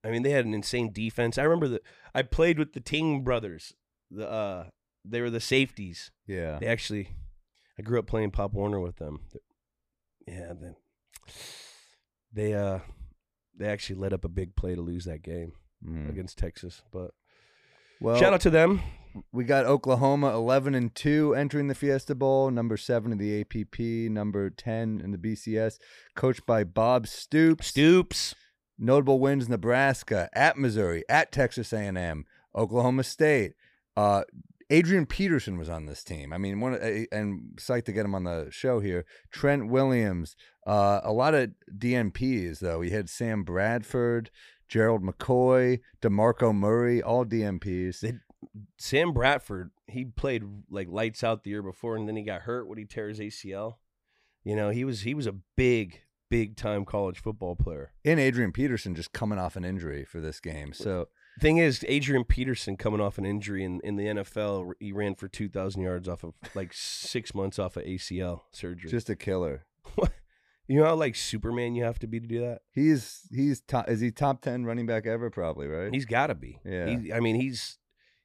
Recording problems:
none

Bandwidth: 15 kHz